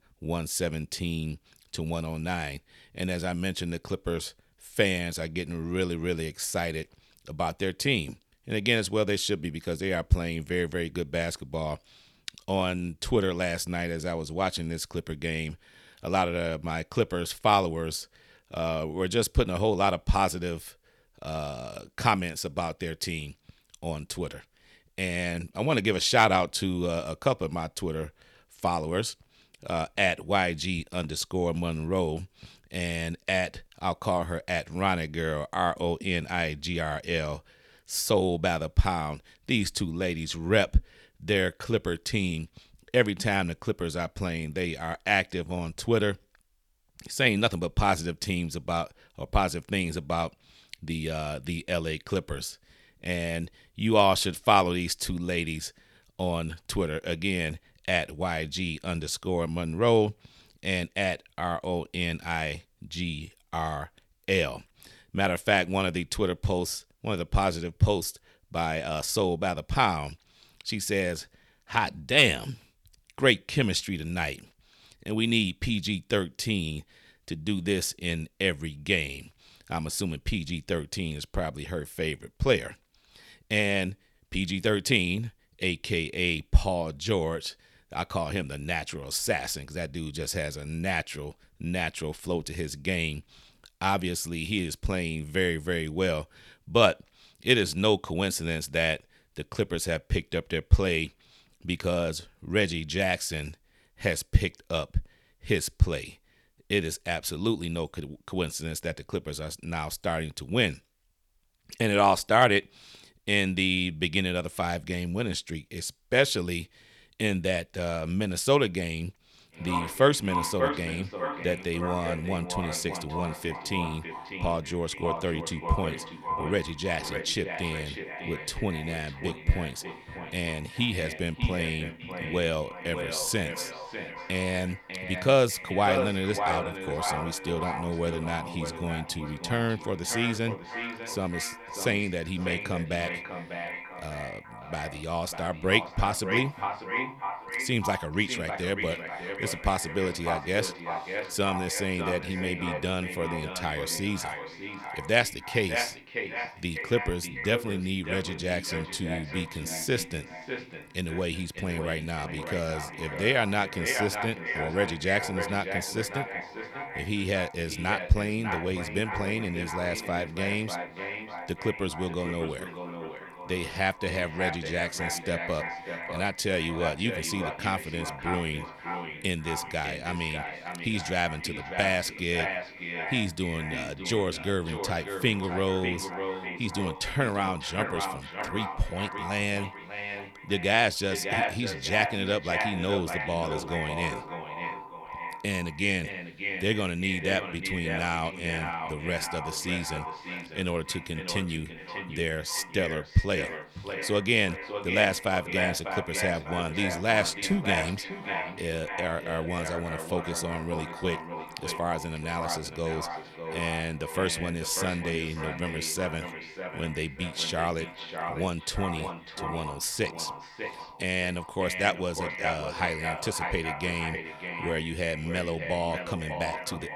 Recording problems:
echo of what is said; strong; from 1:59 on; 600 ms later, 6 dB below the speech

